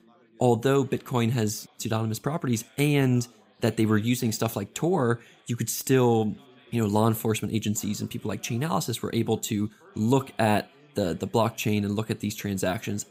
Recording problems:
background chatter; faint; throughout; 3 voices, 30 dB below the speech

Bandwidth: 15.5 kHz